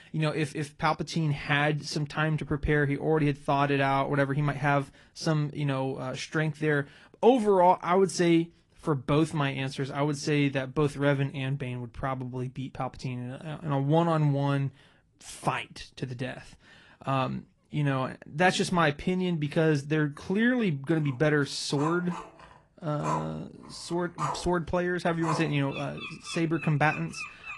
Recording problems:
garbled, watery; slightly; nothing above 10.5 kHz
animal sounds; loud; from 22 s on; 10 dB below the speech

